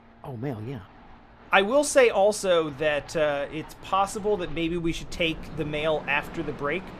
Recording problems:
train or aircraft noise; noticeable; throughout; 20 dB below the speech
rain or running water; faint; throughout; 20 dB below the speech

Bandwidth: 14.5 kHz